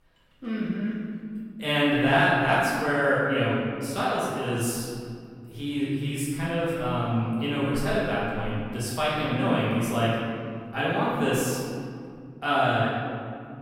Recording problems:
room echo; strong; dies away in 2.2 s
off-mic speech; far

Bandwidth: 16 kHz